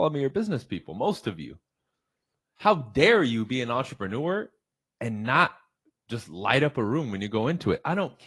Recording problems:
garbled, watery; slightly; nothing above 11.5 kHz
abrupt cut into speech; at the start

